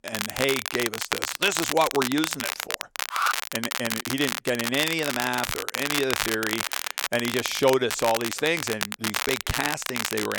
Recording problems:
crackle, like an old record; loud; 2 dB below the speech
alarm; loud; at 3 s; peak 1 dB above the speech
abrupt cut into speech; at the end

